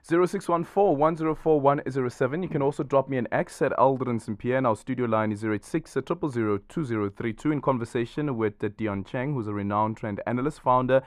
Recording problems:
muffled; very; fading above 3 kHz

